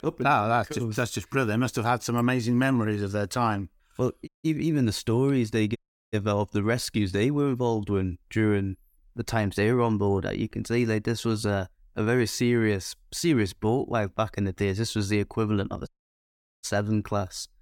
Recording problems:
audio cutting out; at 4.5 s, at 6 s and at 16 s for 0.5 s

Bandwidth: 18 kHz